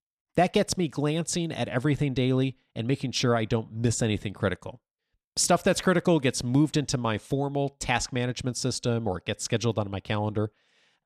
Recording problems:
none

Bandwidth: 13.5 kHz